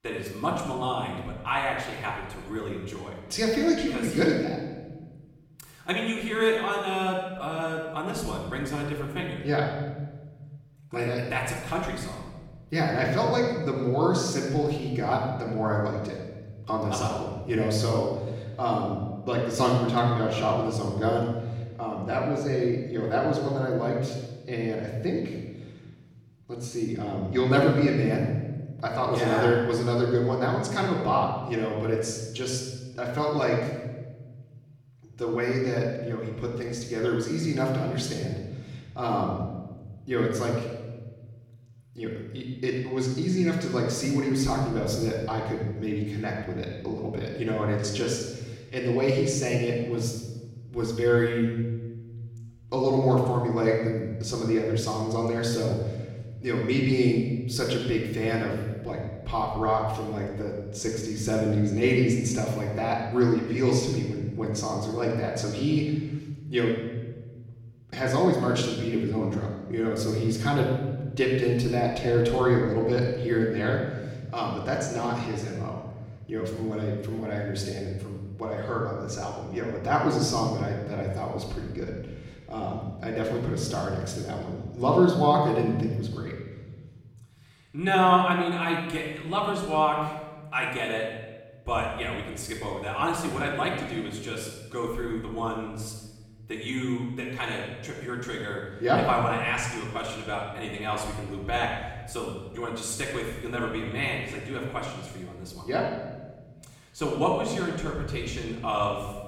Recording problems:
off-mic speech; far
room echo; noticeable; dies away in 1.5 s

